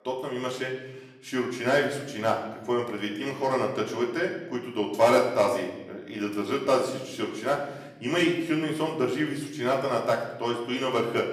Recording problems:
off-mic speech; far
room echo; slight; dies away in 1 s

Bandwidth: 14.5 kHz